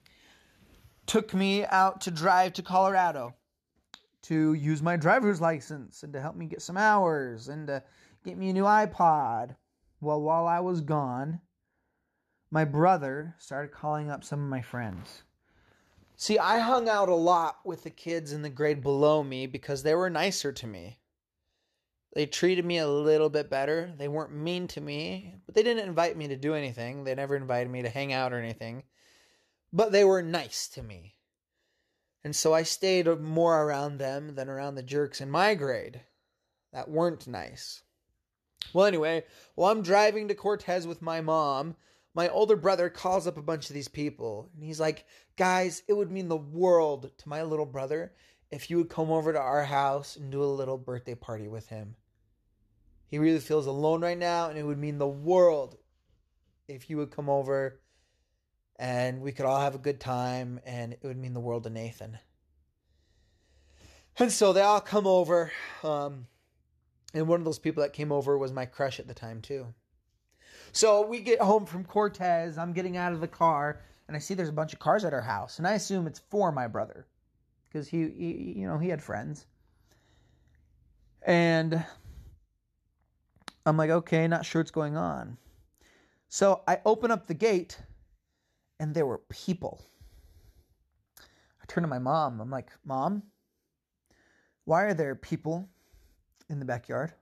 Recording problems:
none

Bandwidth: 13.5 kHz